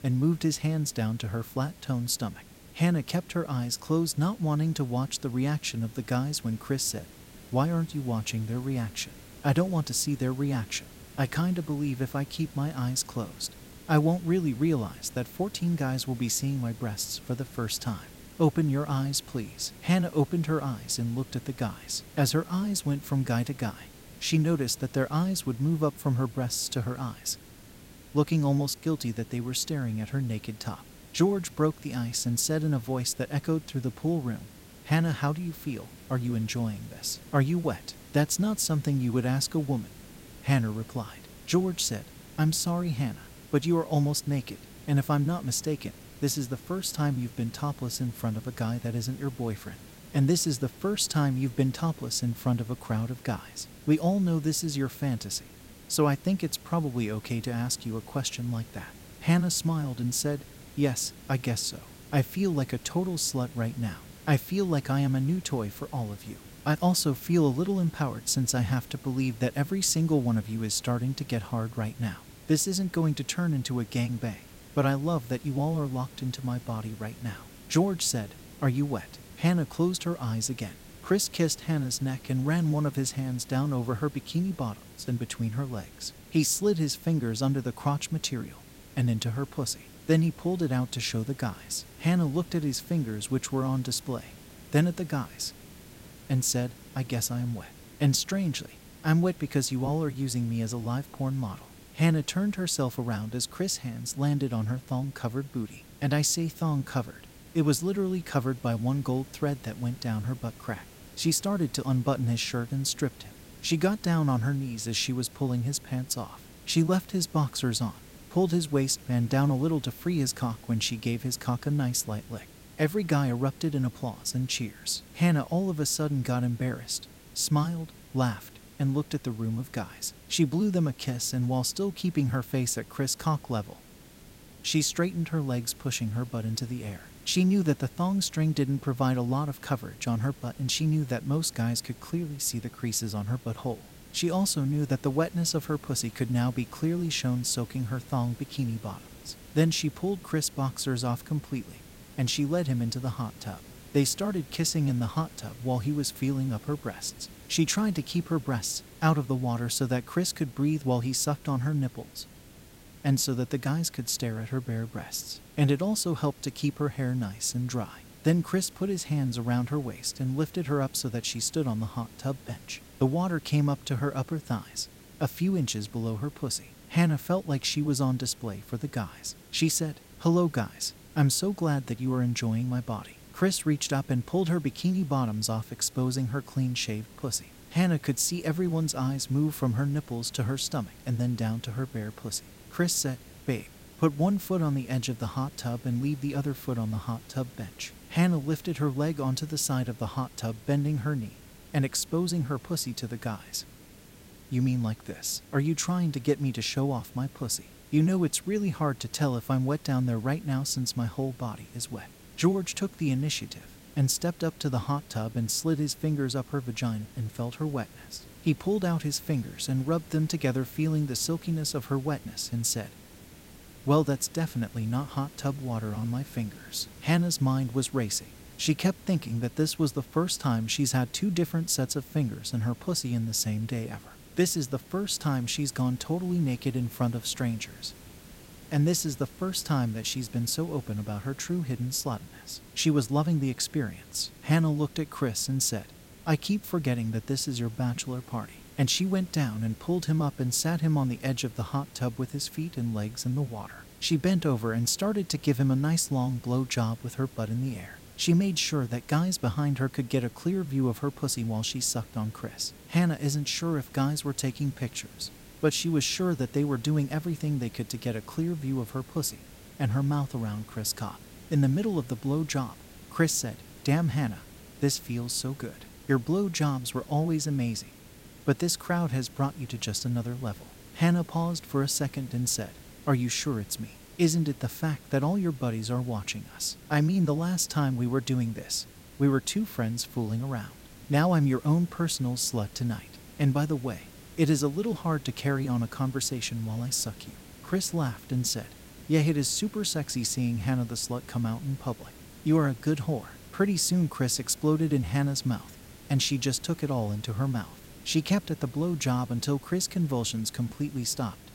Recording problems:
hiss; faint; throughout; 20 dB below the speech

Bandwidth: 16 kHz